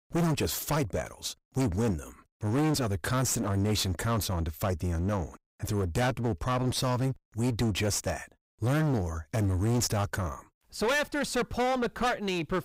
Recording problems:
distortion; heavy; 20% of the sound clipped

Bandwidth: 15.5 kHz